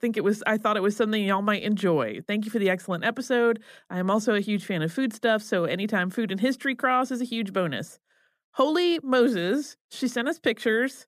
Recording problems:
none

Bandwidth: 14.5 kHz